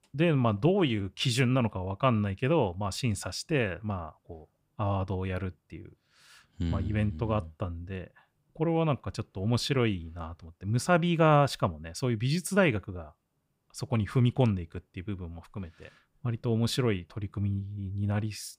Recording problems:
none

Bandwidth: 15.5 kHz